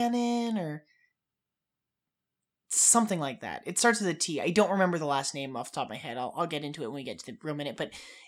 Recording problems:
abrupt cut into speech; at the start

